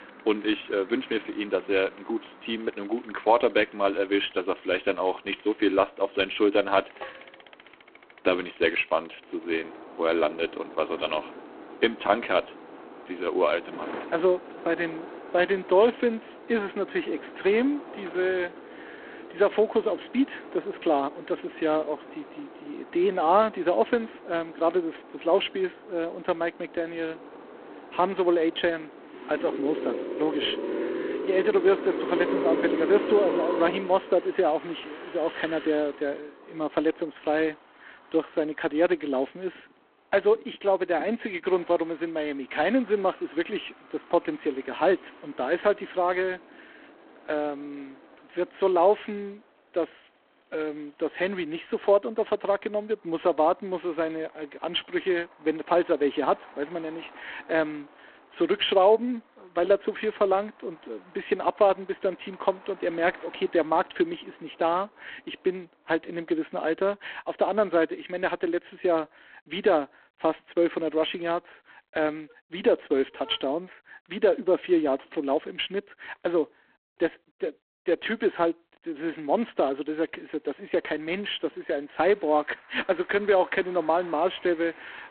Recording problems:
phone-call audio; poor line
traffic noise; noticeable; throughout; 10 dB below the speech

